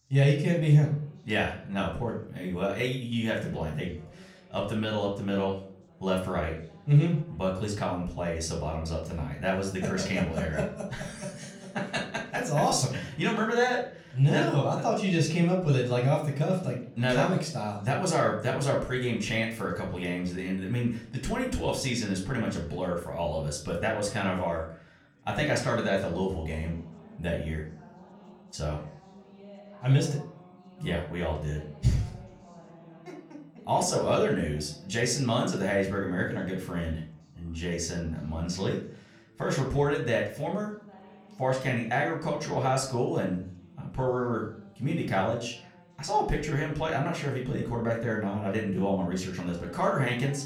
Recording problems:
room echo; slight; dies away in 0.4 s
off-mic speech; somewhat distant
background chatter; faint; throughout; 3 voices, 25 dB below the speech

